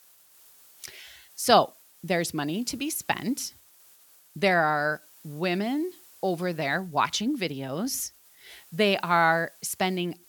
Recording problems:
hiss; faint; throughout; 25 dB below the speech

